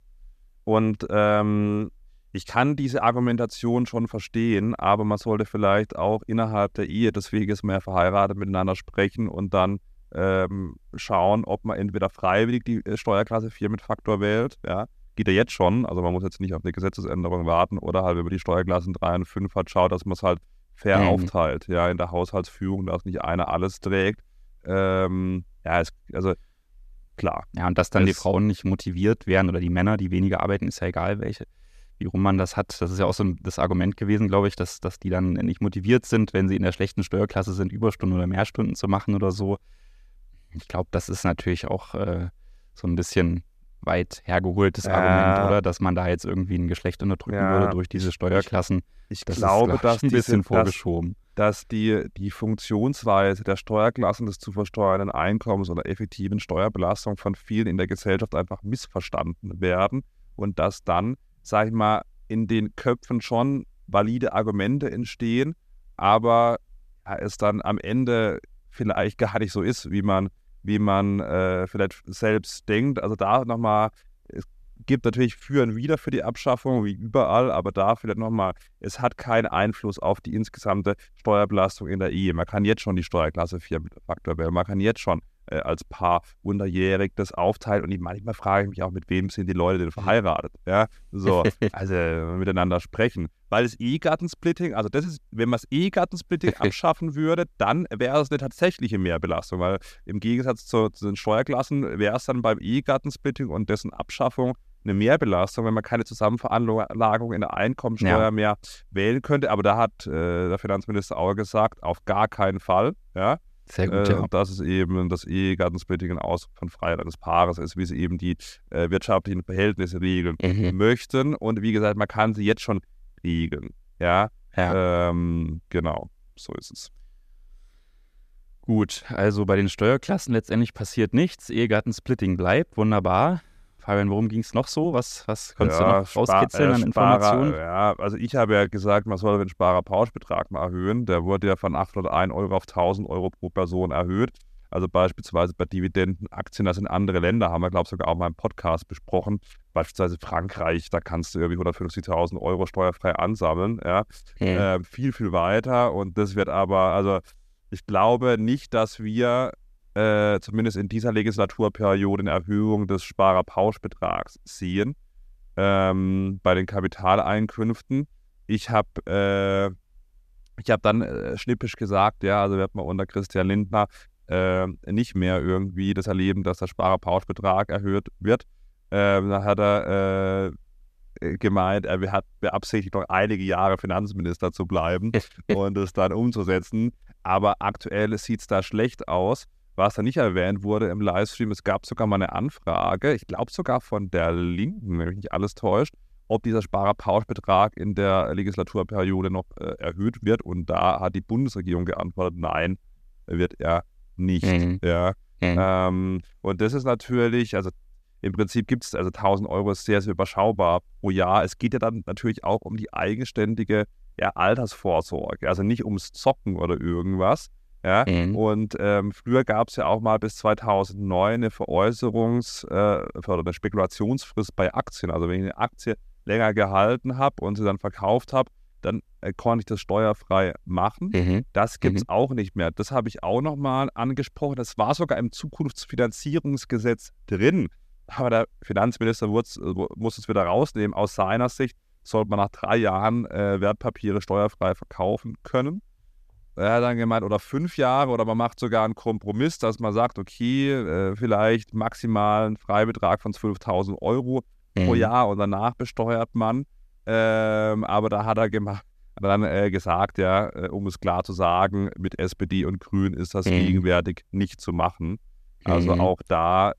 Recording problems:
none

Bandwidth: 14.5 kHz